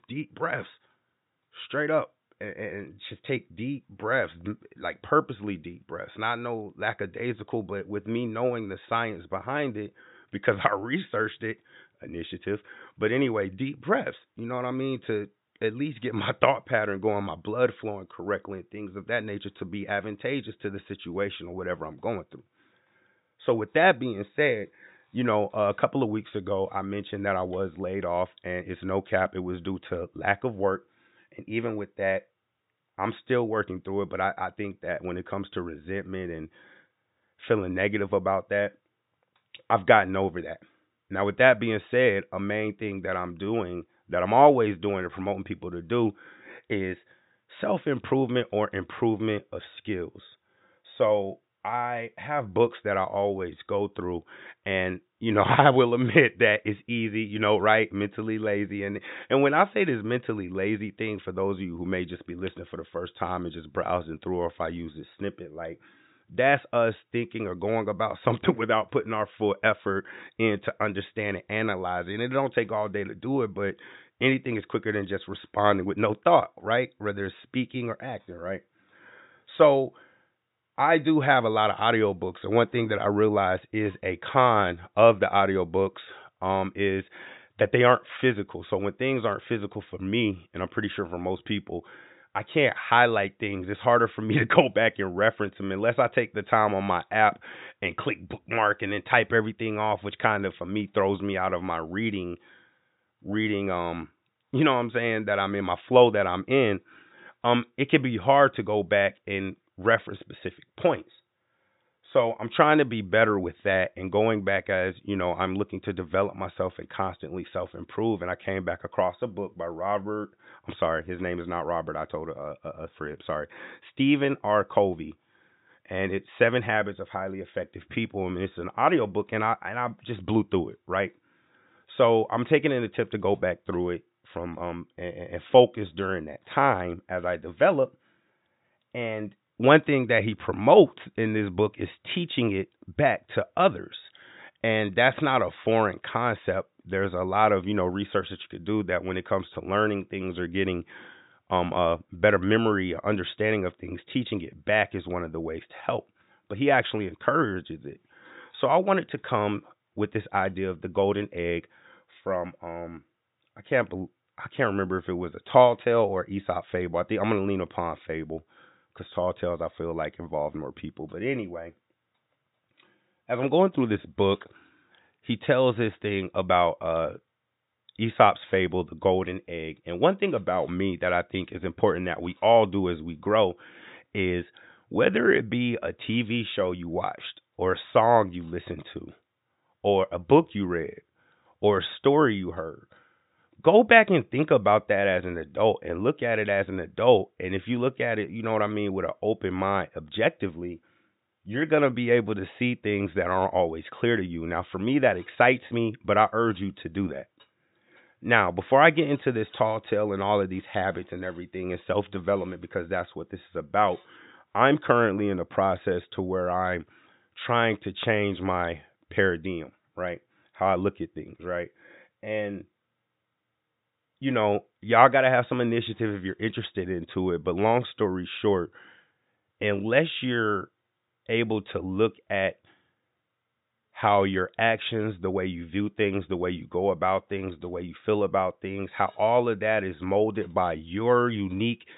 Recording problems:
high frequencies cut off; severe; nothing above 4 kHz

